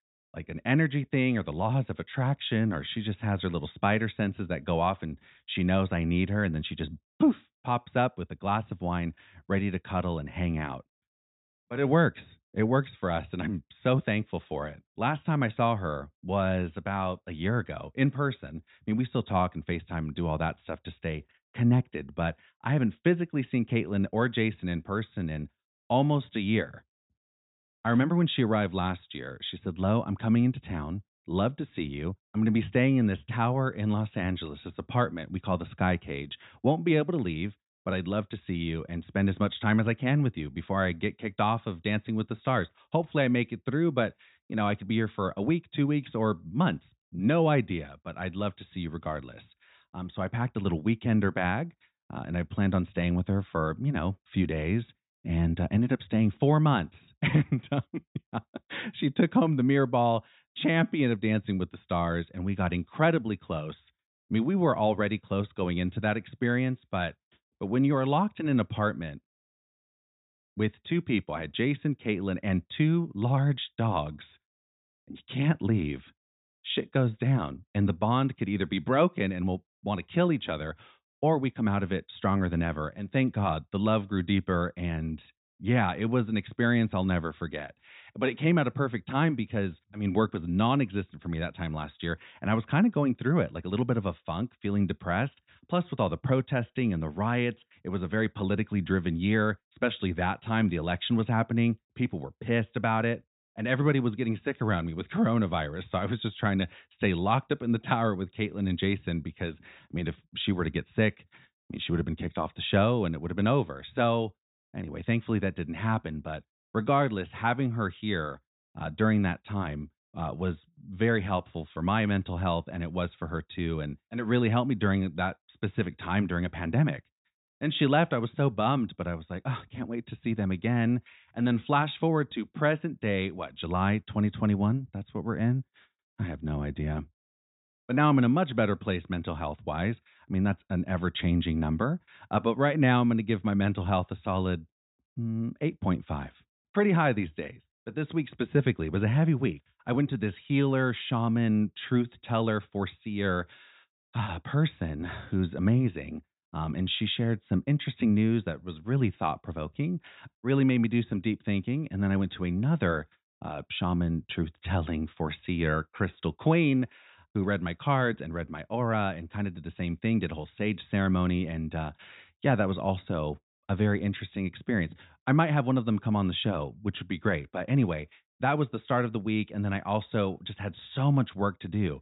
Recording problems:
high frequencies cut off; severe; nothing above 4 kHz

